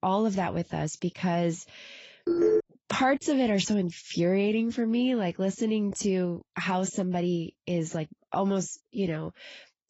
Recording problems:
garbled, watery; badly; nothing above 7.5 kHz
phone ringing; loud; at 2.5 s; peak 4 dB above the speech

